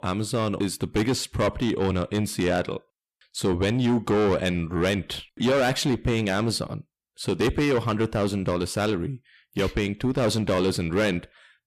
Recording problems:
distortion; heavy; 8 dB below the speech

